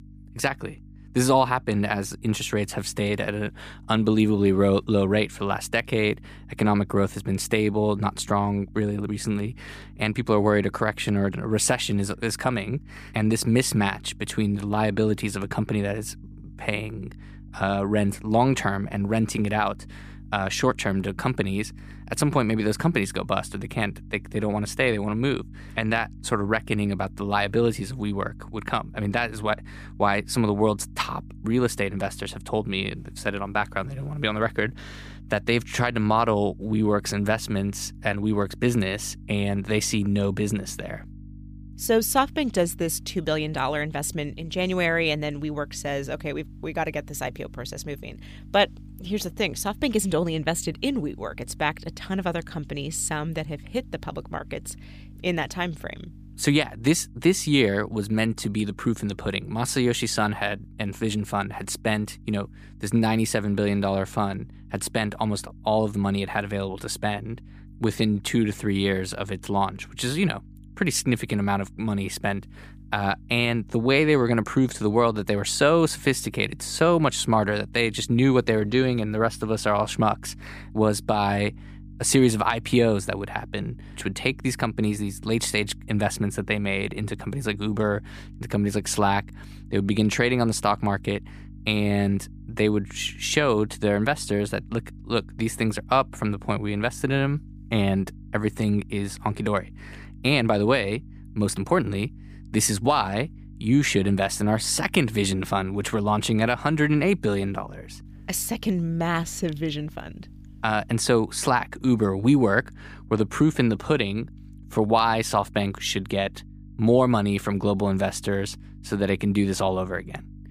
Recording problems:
electrical hum; faint; throughout; 50 Hz, 30 dB below the speech

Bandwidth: 15 kHz